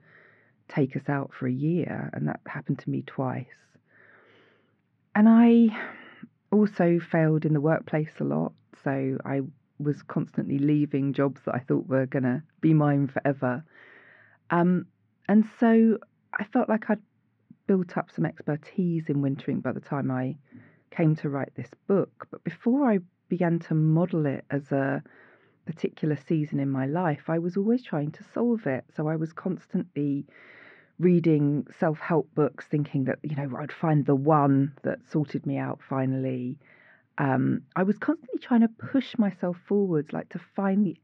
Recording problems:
muffled; very; fading above 2.5 kHz

